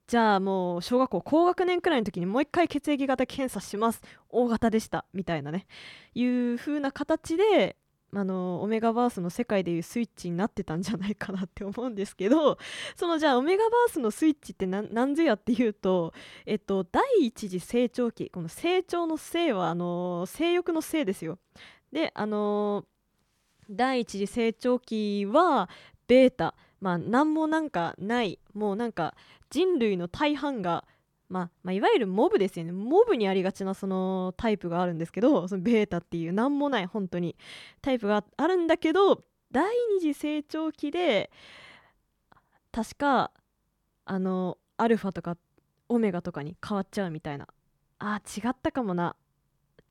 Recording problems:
none

